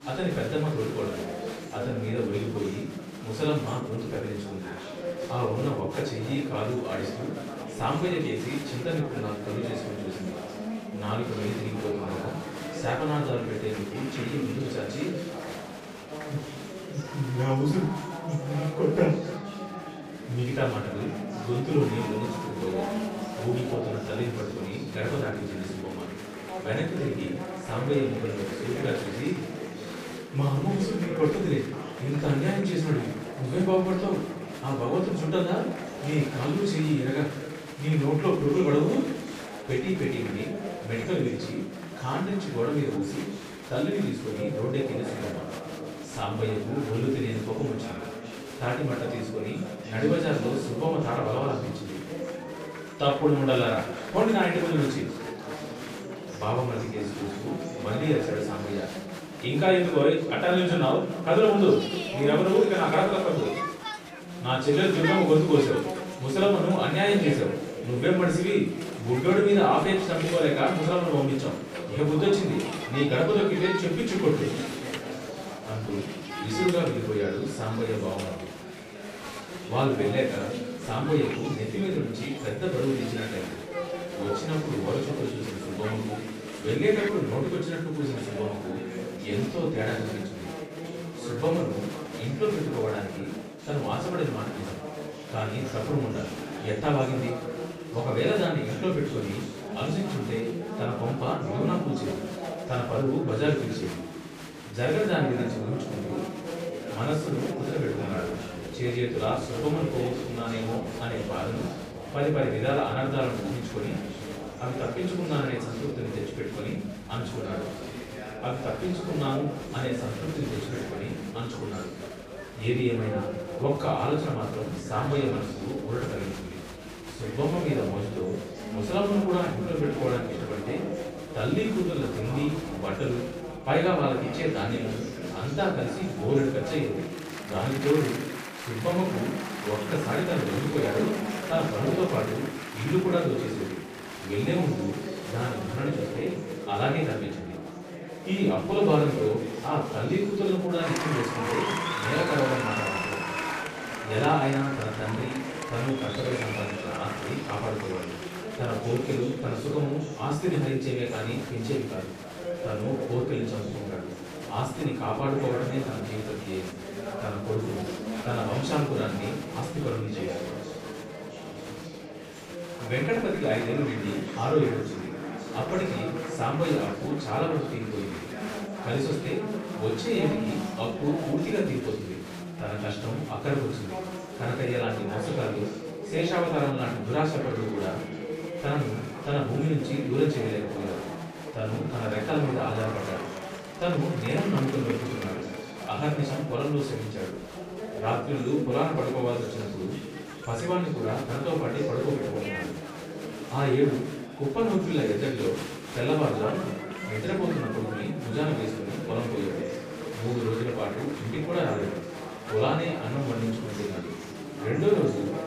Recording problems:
off-mic speech; far
echo of what is said; noticeable; throughout; 270 ms later, 15 dB below the speech
room echo; noticeable; dies away in 0.5 s
chatter from many people; loud; throughout; 8 dB below the speech

